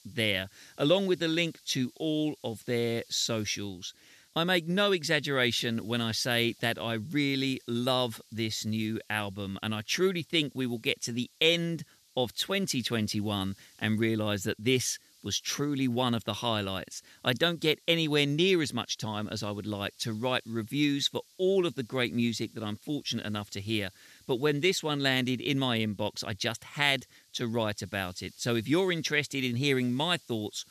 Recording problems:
hiss; faint; throughout; 30 dB below the speech

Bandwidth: 14 kHz